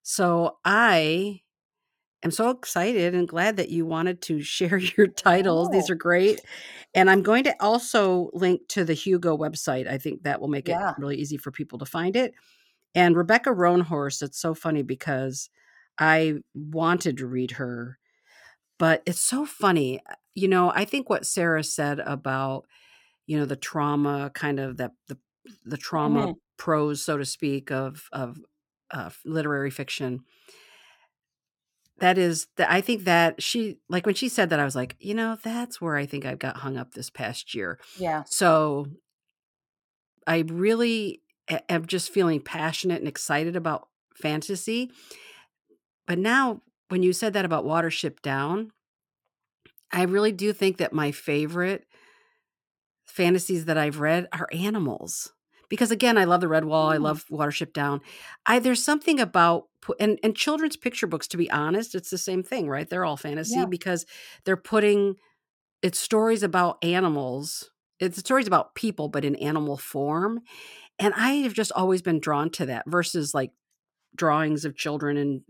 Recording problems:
none

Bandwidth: 17 kHz